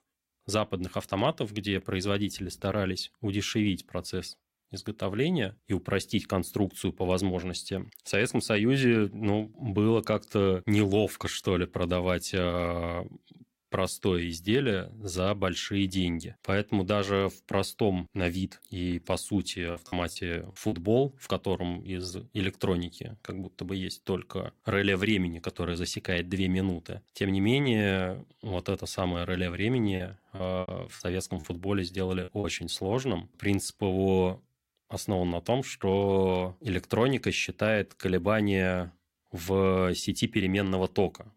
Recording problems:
choppy; very; from 20 to 21 s and from 30 to 32 s; 11% of the speech affected

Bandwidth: 16 kHz